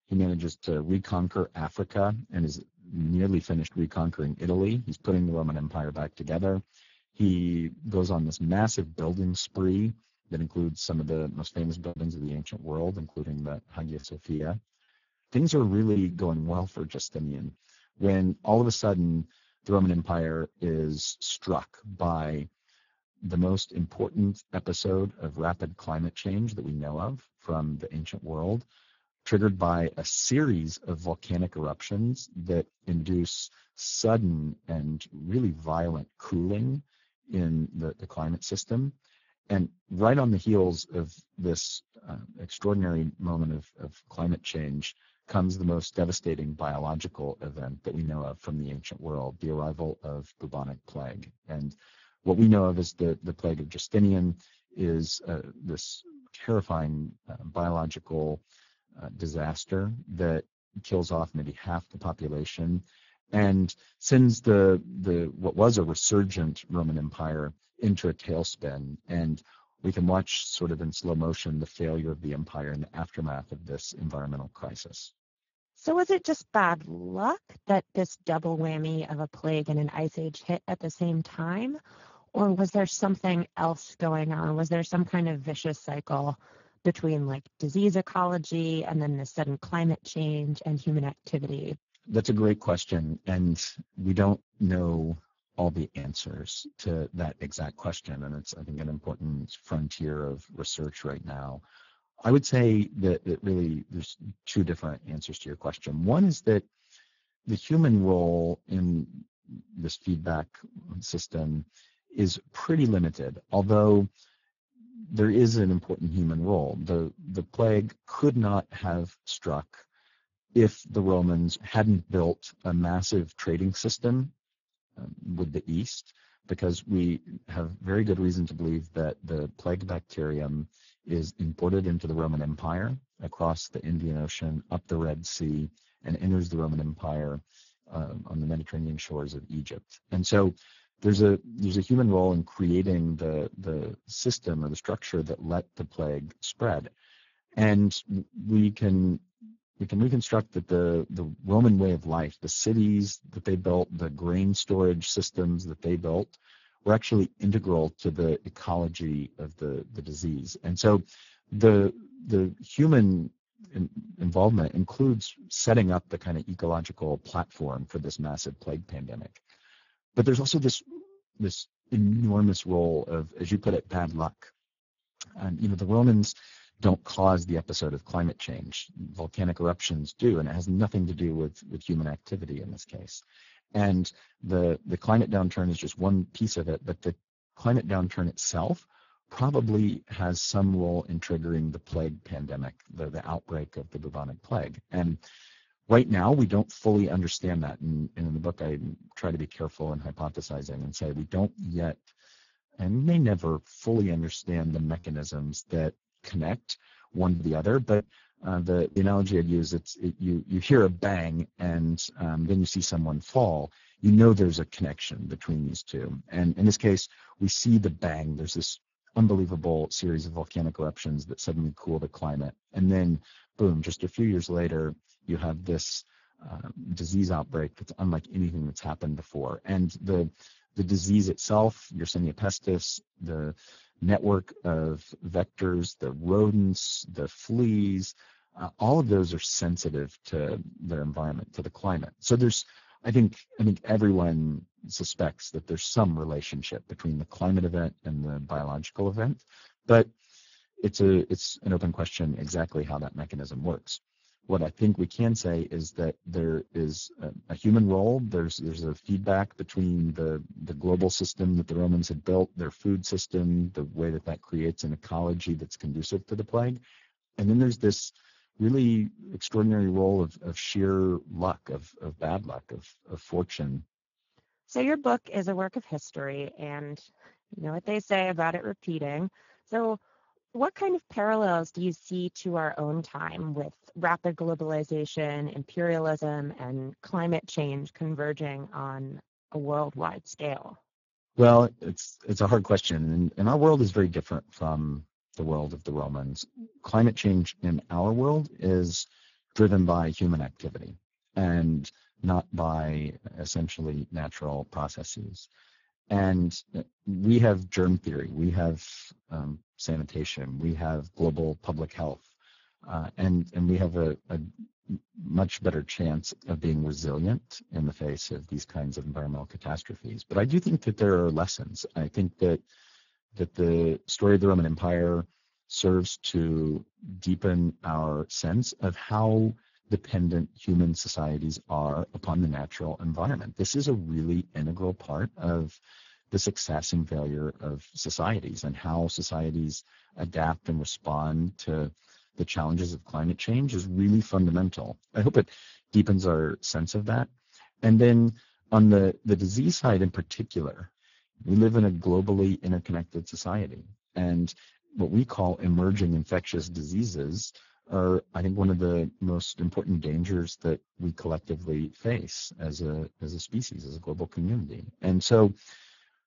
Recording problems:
garbled, watery; badly
high frequencies cut off; noticeable; nothing above 7 kHz
choppy; occasionally; from 12 to 16 s, at 1:36 and from 3:27 to 3:29; 5% of the speech affected

